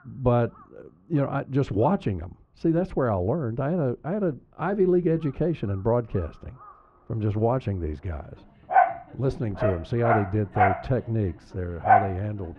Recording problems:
muffled; very; fading above 3 kHz
animal sounds; very loud; throughout; 2 dB above the speech

